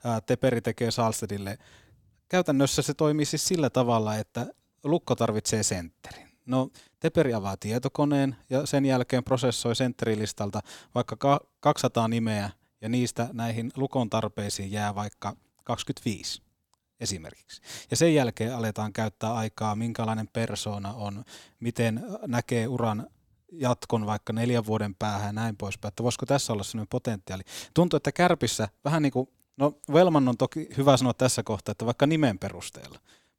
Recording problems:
none

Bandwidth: 18.5 kHz